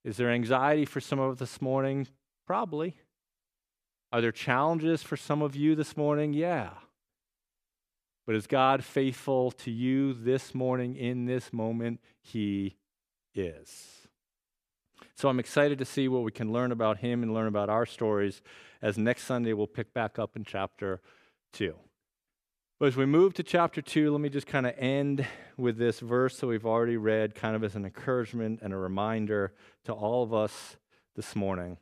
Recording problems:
none

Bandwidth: 14.5 kHz